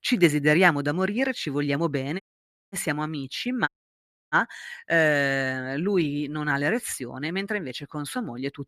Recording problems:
audio cutting out; at 2 s for 0.5 s and at 3.5 s for 0.5 s

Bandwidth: 14.5 kHz